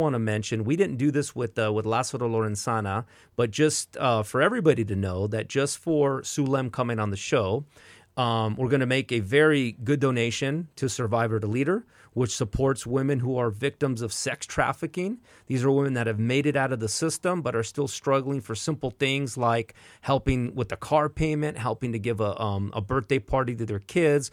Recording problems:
abrupt cut into speech; at the start

